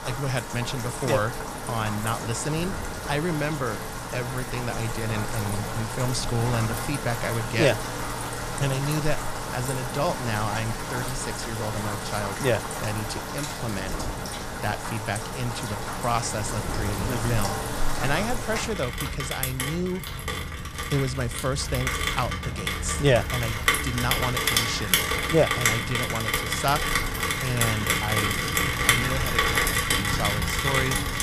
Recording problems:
rain or running water; very loud; throughout; 1 dB above the speech
wind noise on the microphone; occasional gusts; 20 dB below the speech

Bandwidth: 14.5 kHz